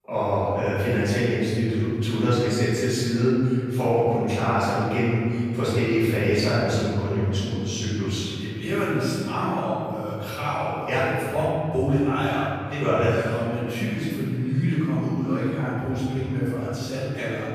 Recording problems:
room echo; strong; dies away in 2.5 s
off-mic speech; far

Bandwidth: 14.5 kHz